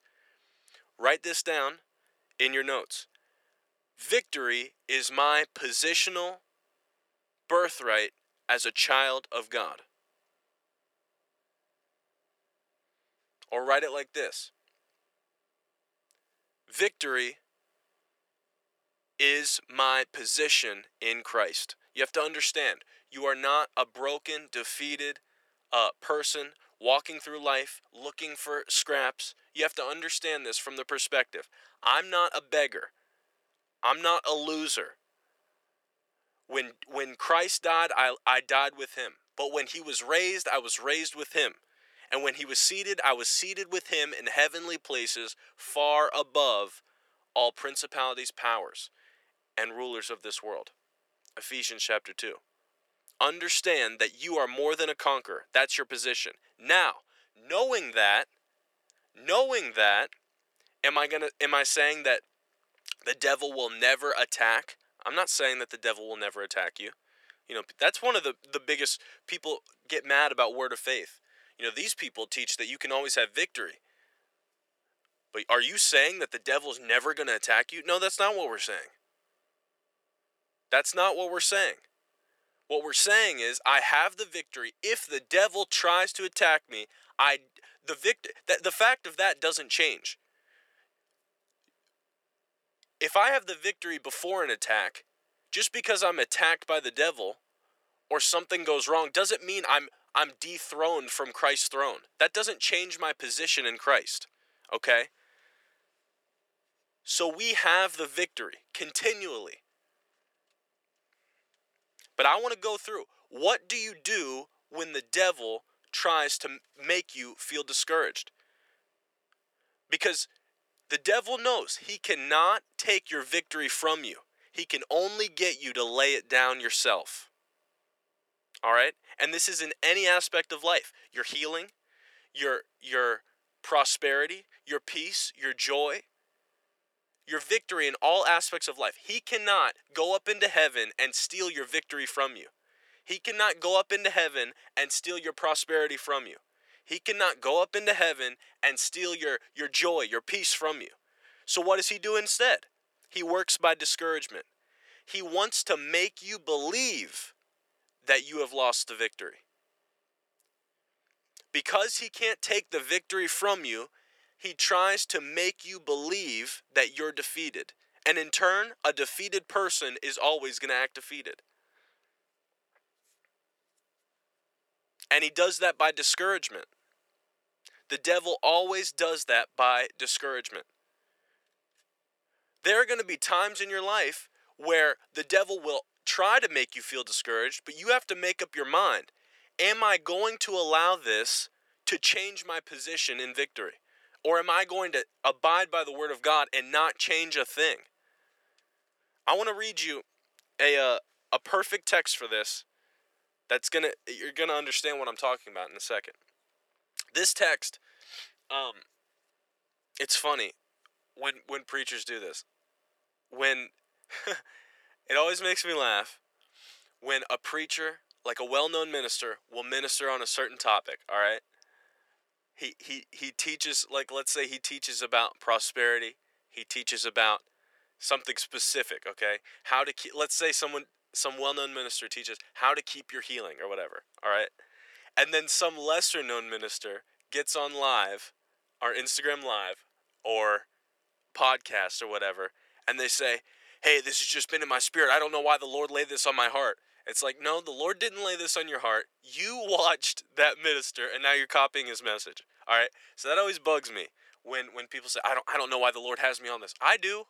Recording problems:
thin; very; fading below 400 Hz

